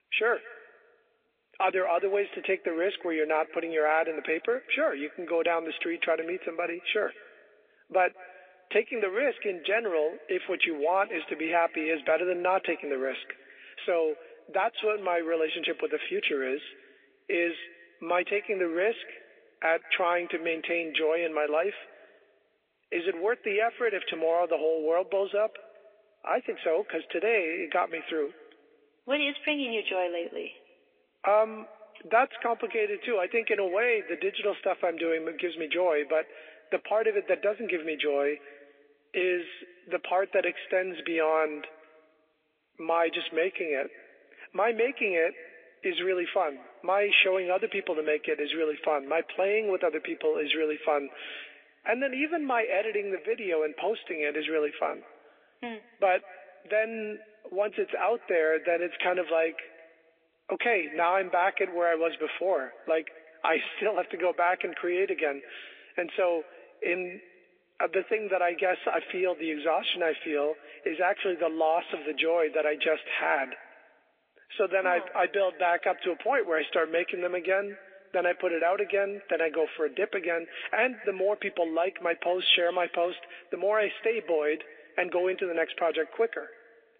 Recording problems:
thin; somewhat; fading below 400 Hz
echo of what is said; faint; throughout; 200 ms later, 20 dB below the speech
phone-call audio; nothing above 3.5 kHz
garbled, watery; slightly

